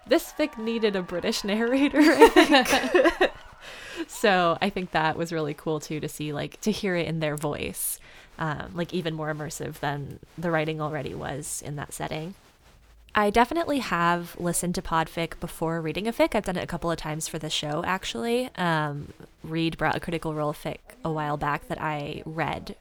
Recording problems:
crowd noise; faint; throughout; 25 dB below the speech

